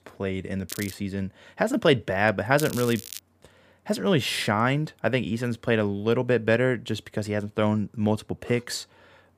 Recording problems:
crackling; noticeable; at 0.5 s and at 2.5 s; 10 dB below the speech

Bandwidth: 15 kHz